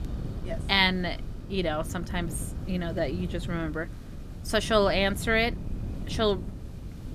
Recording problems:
wind noise on the microphone; occasional gusts; 20 dB below the speech
hiss; faint; throughout; 25 dB below the speech

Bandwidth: 14.5 kHz